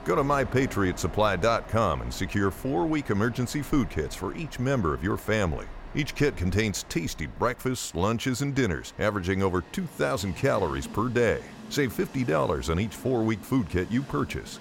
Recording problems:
train or aircraft noise; noticeable; throughout; 15 dB below the speech

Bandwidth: 16.5 kHz